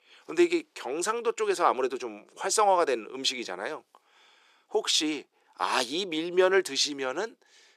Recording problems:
thin; very; fading below 350 Hz

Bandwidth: 14 kHz